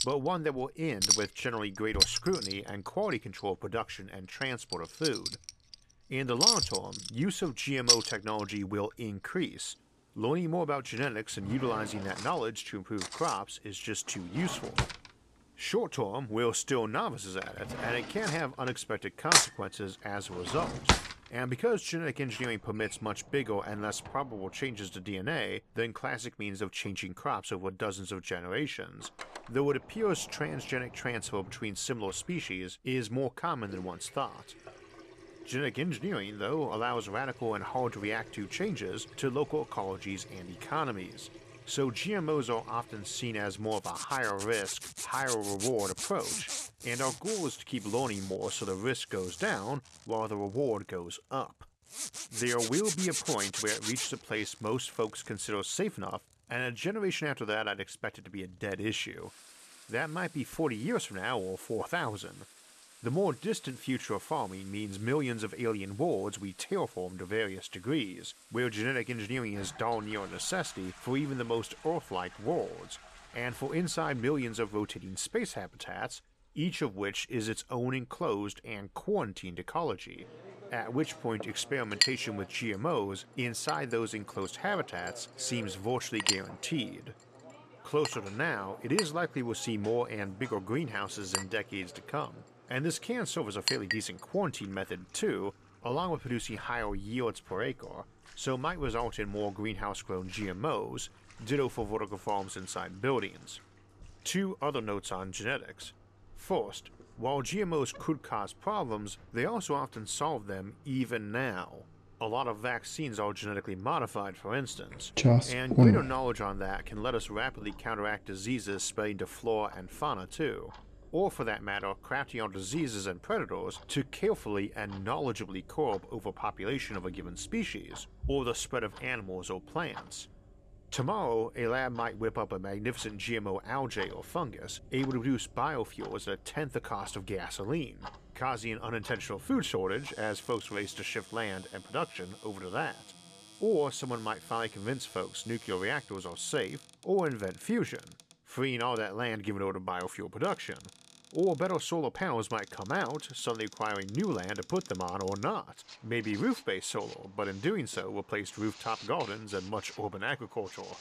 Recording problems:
household noises; very loud; throughout; 1 dB above the speech

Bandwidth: 14.5 kHz